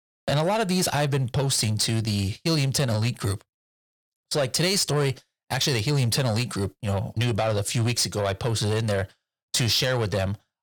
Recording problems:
distortion; slight; 10 dB below the speech

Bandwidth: 18.5 kHz